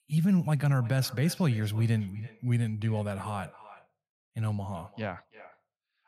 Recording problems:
echo of what is said; faint; throughout; 330 ms later, 20 dB below the speech

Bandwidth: 14.5 kHz